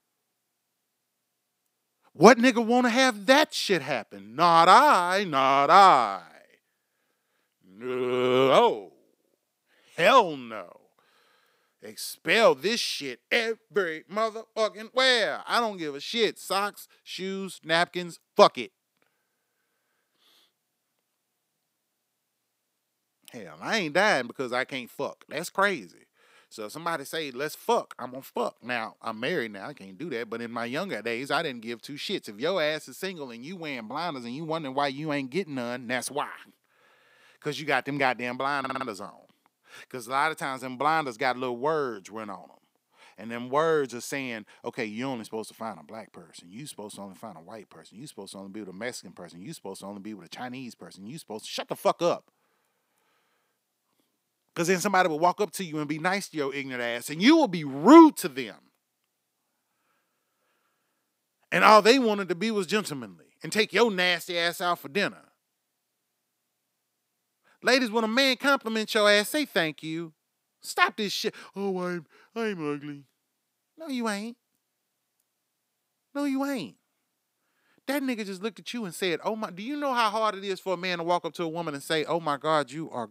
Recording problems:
audio stuttering; at 39 s

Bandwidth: 15.5 kHz